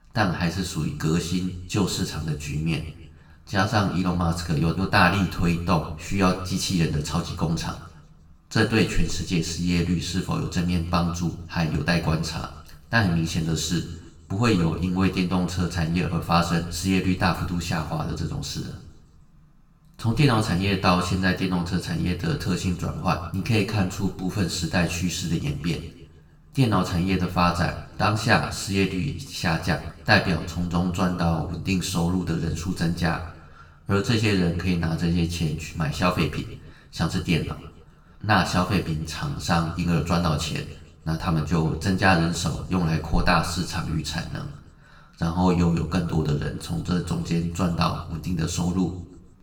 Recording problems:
room echo; slight; dies away in 0.7 s
off-mic speech; somewhat distant

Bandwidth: 18 kHz